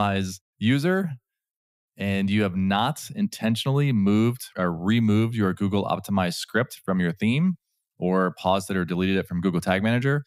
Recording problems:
abrupt cut into speech; at the start

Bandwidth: 15.5 kHz